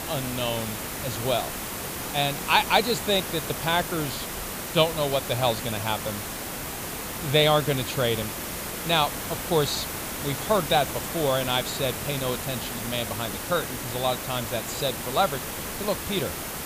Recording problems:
hiss; loud; throughout; 5 dB below the speech

